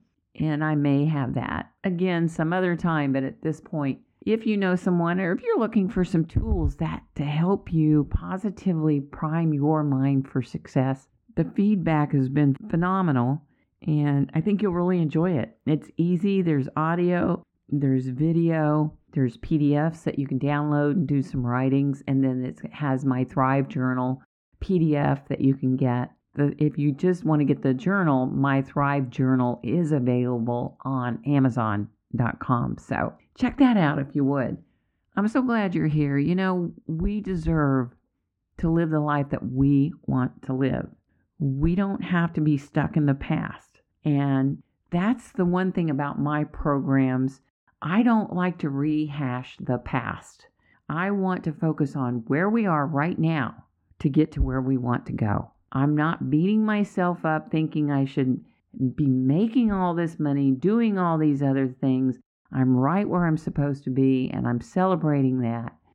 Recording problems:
muffled; very; fading above 4 kHz

